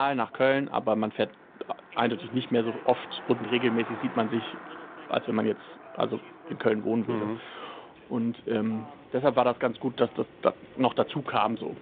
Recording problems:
phone-call audio; nothing above 3.5 kHz
traffic noise; noticeable; throughout; 15 dB below the speech
voice in the background; faint; throughout; 20 dB below the speech
abrupt cut into speech; at the start

